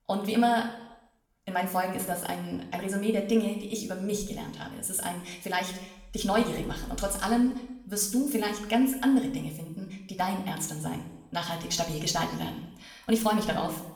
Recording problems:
wrong speed, natural pitch; too fast; 1.6 times normal speed
room echo; slight; dies away in 0.8 s
off-mic speech; somewhat distant

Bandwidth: 19 kHz